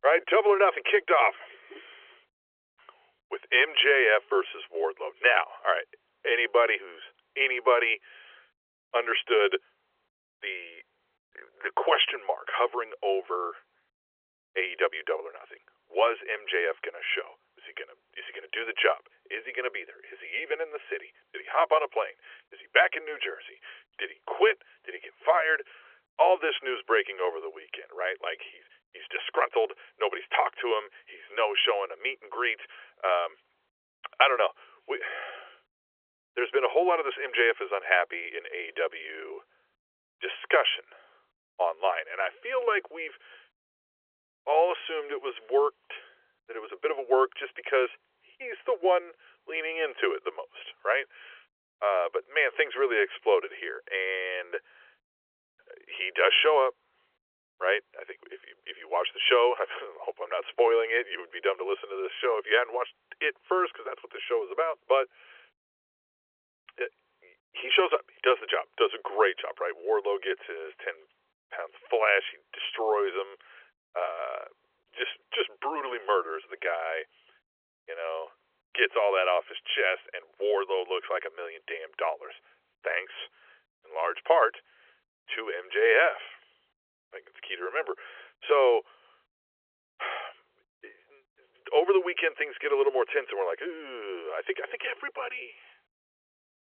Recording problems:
phone-call audio; nothing above 3.5 kHz

